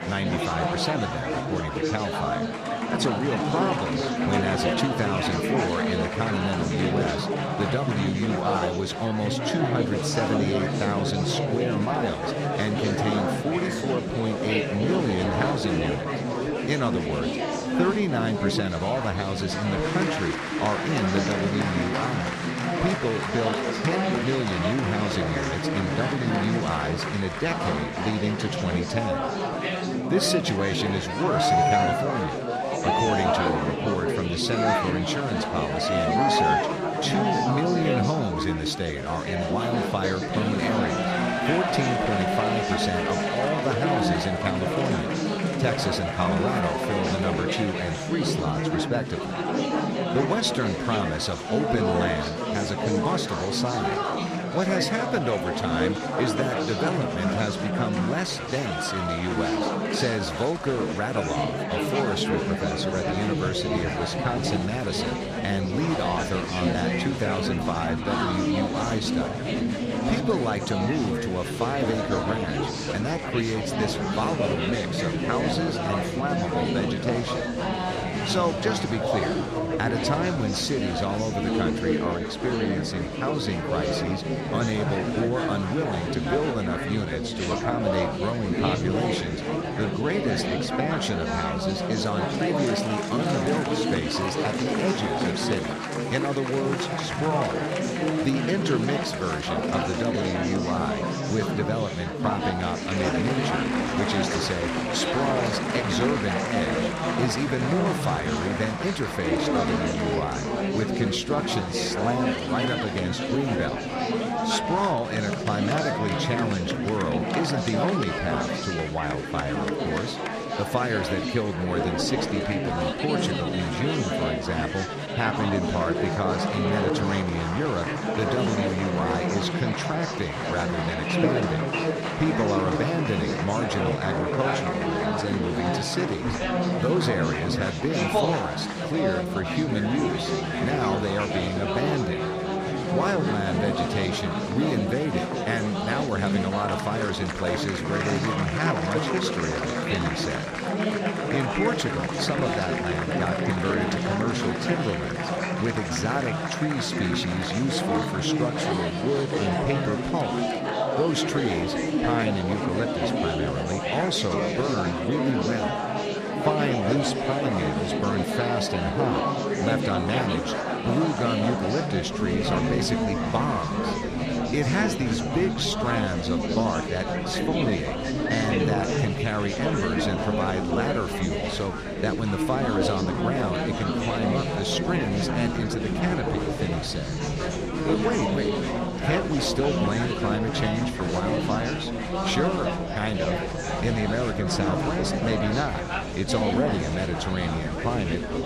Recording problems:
murmuring crowd; very loud; throughout; 2 dB above the speech

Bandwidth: 14.5 kHz